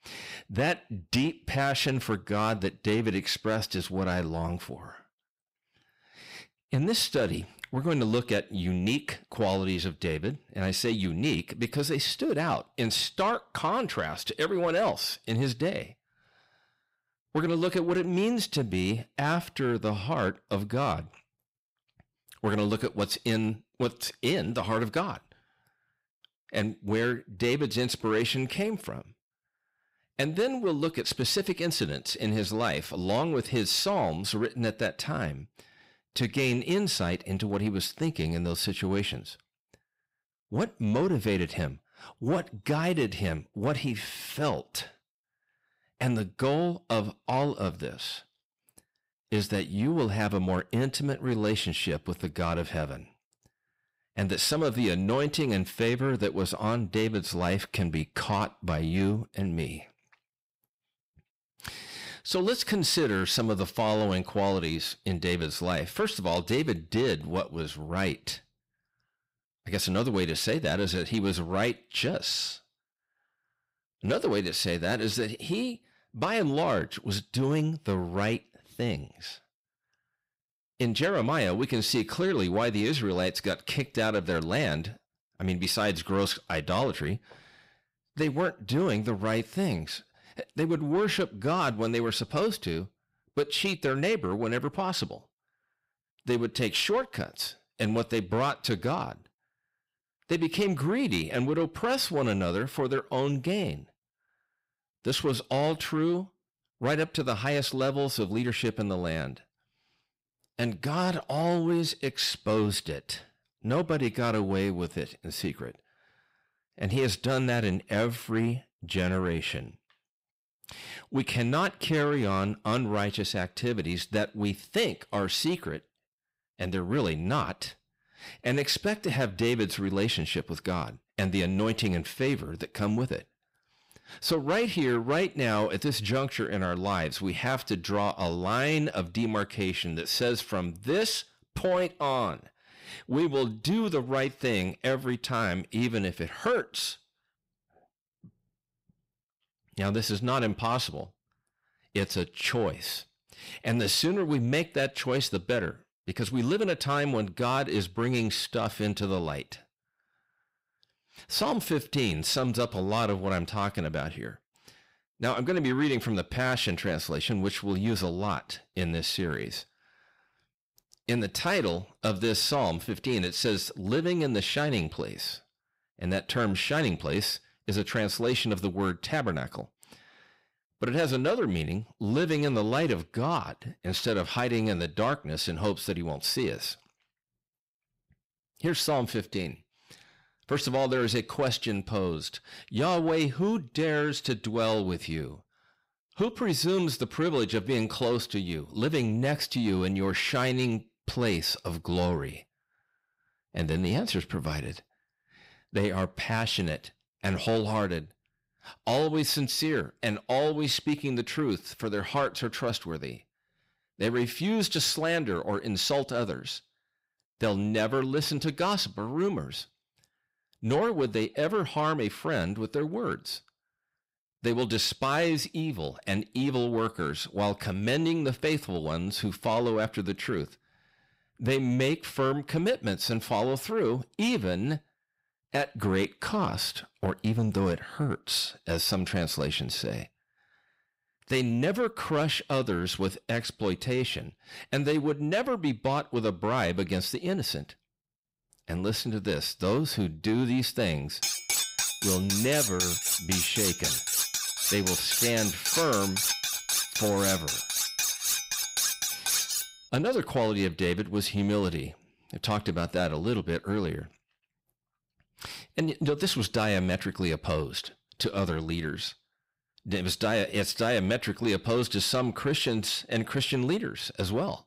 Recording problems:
distortion; slight; 10 dB below the speech
clattering dishes; loud; from 4:11 to 4:20; peak 4 dB above the speech

